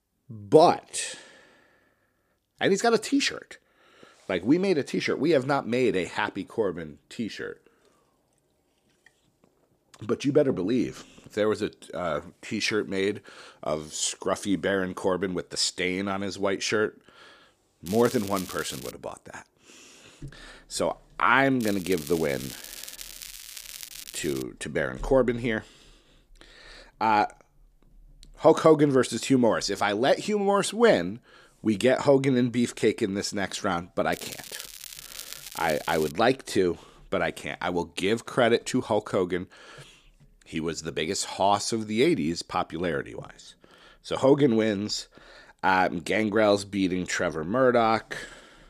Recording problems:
crackling; noticeable; from 18 to 19 s, from 22 to 24 s and from 34 to 36 s; 15 dB below the speech

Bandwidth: 15 kHz